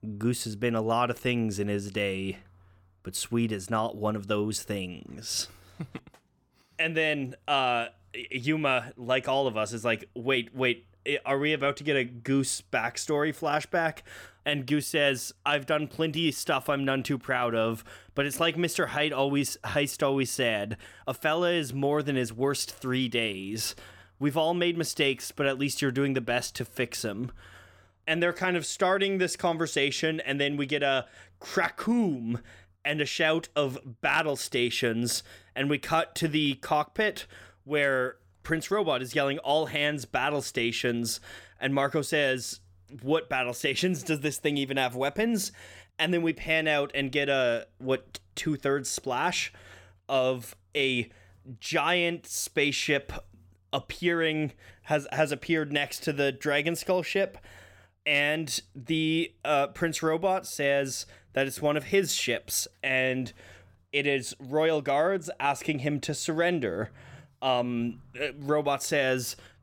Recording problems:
none

